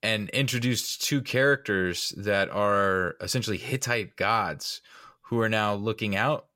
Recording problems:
none

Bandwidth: 16 kHz